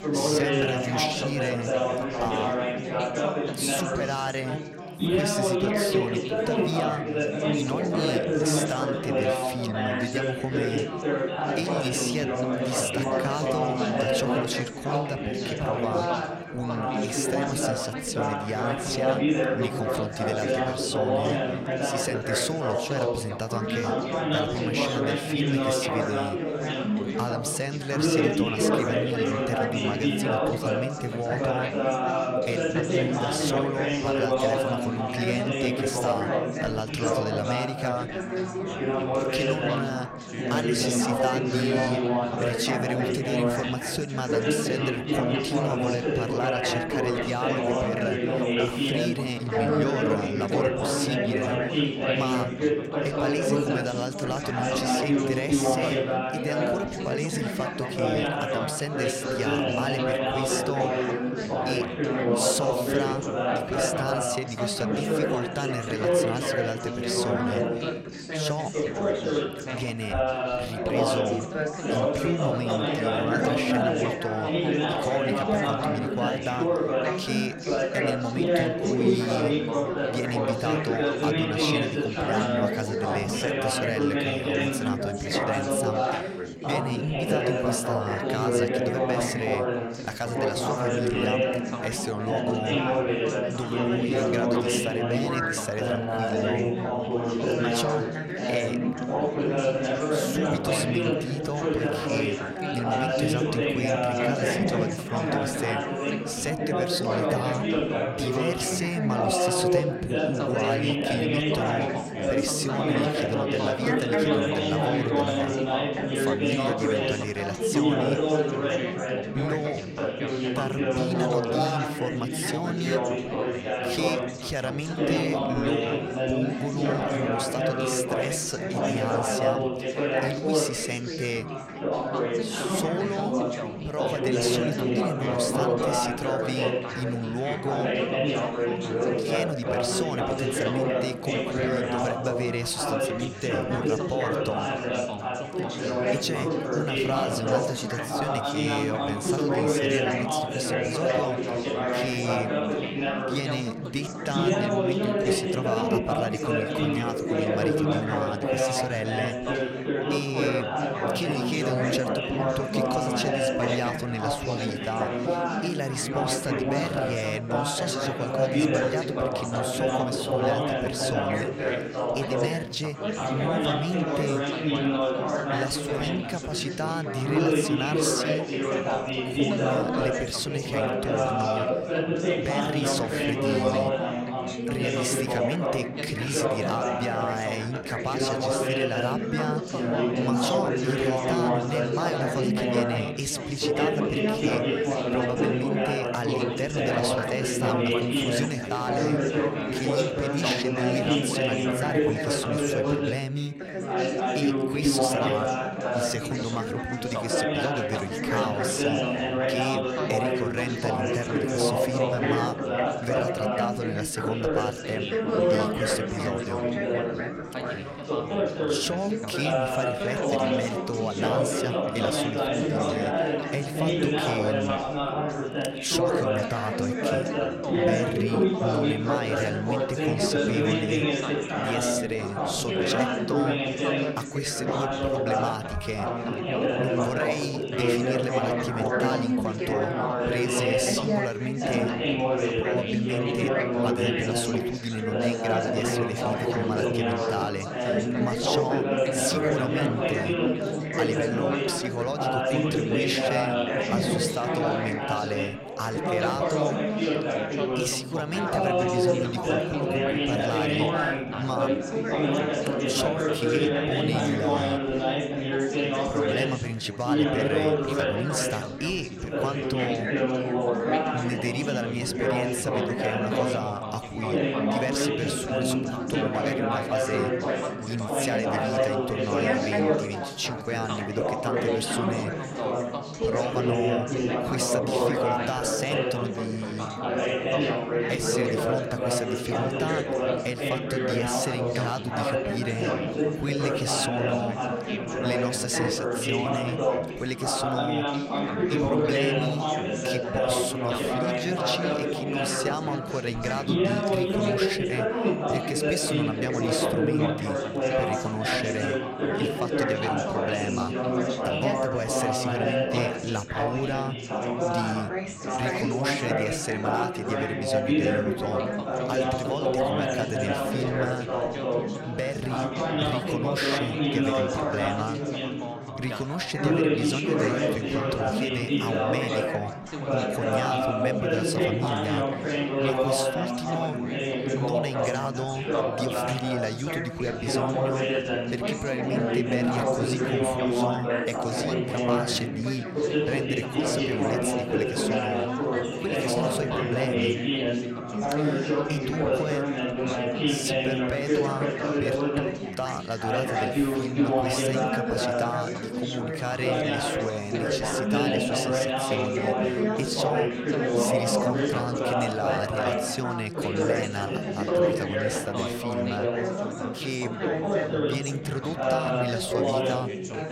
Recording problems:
chatter from many people; very loud; throughout; 5 dB above the speech

